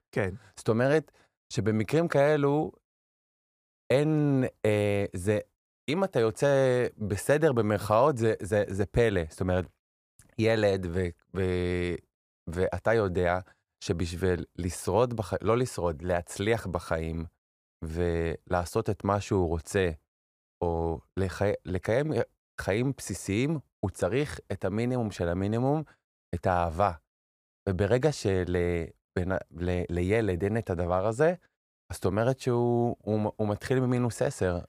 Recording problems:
muffled; slightly; fading above 2 kHz

